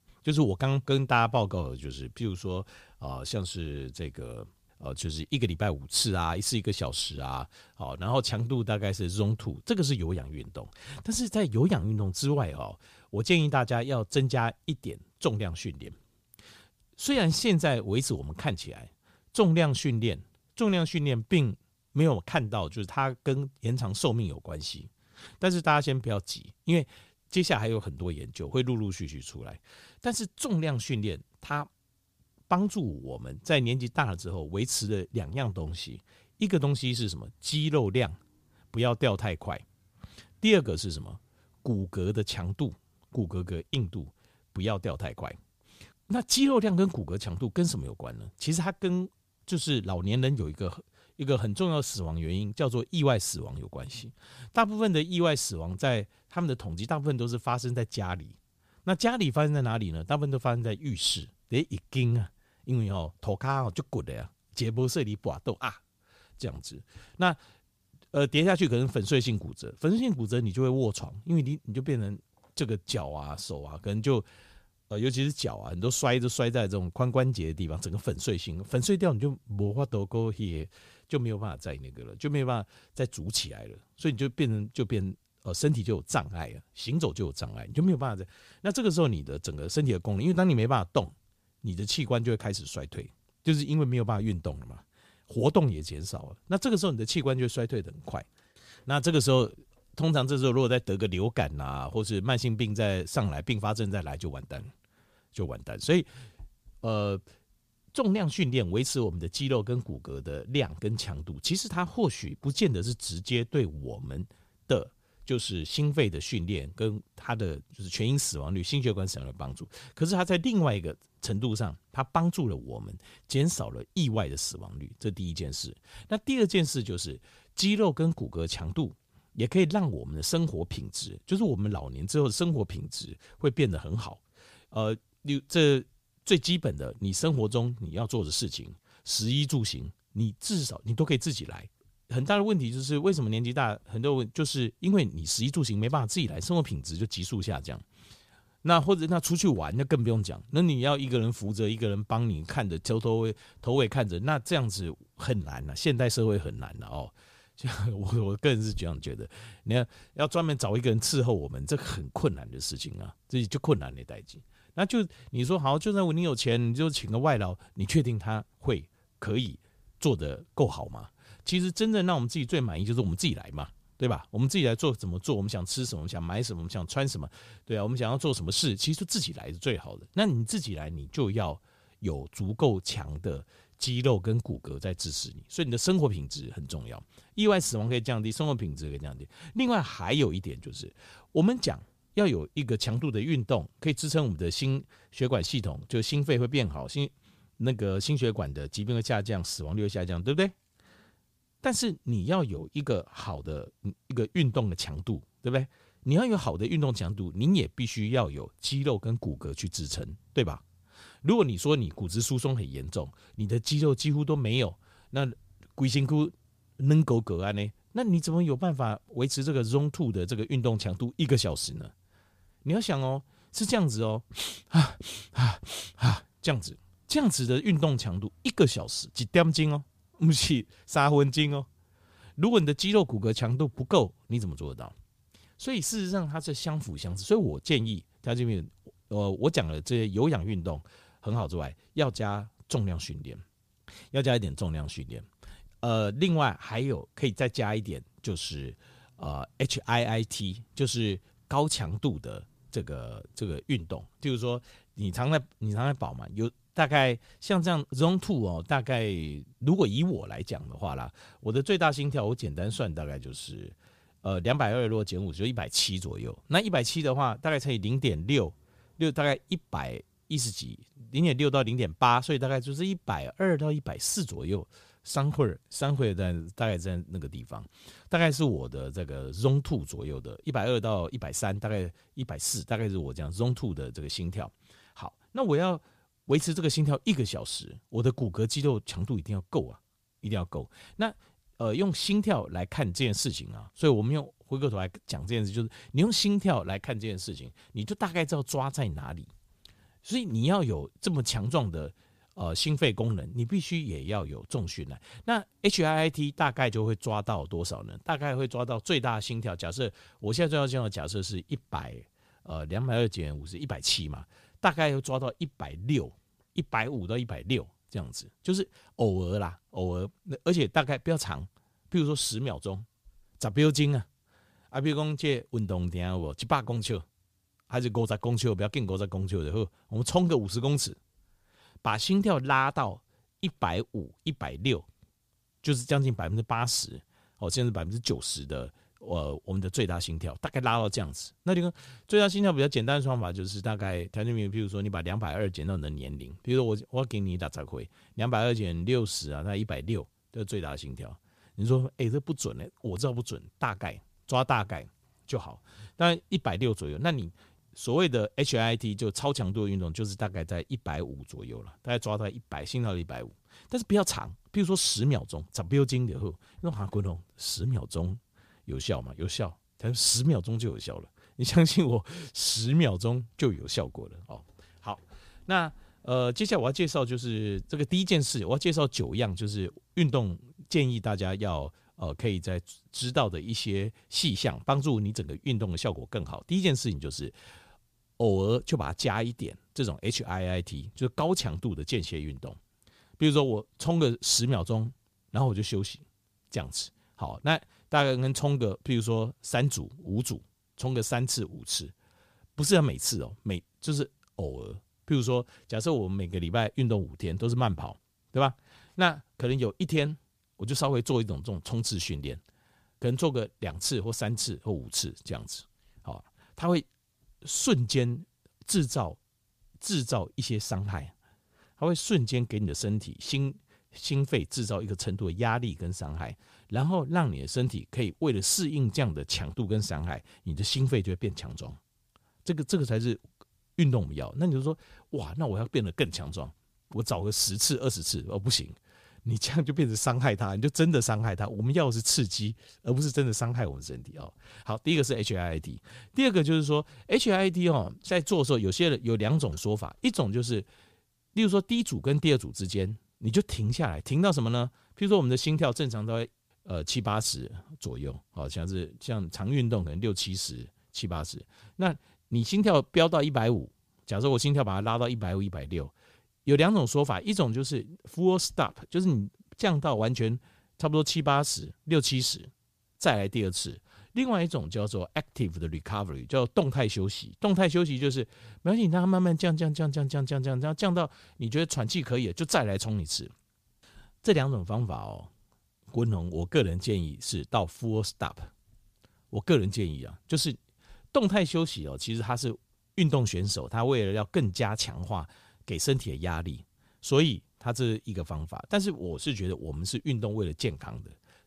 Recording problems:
none

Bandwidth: 15 kHz